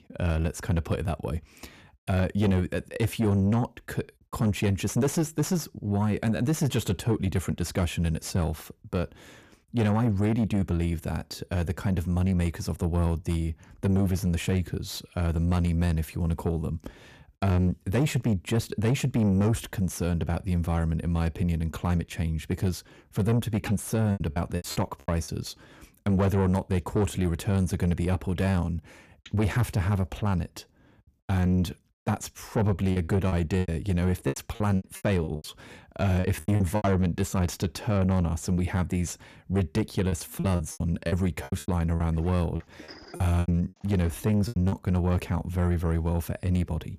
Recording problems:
distortion; slight; 10 dB below the speech
choppy; very; from 24 to 25 s, from 33 to 37 s and from 40 to 45 s; 20% of the speech affected

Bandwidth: 14.5 kHz